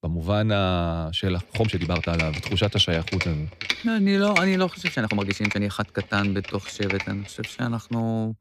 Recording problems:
uneven, jittery; strongly; from 1.5 to 7.5 s
keyboard typing; noticeable; from 1.5 to 7.5 s; peak 1 dB below the speech

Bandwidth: 14.5 kHz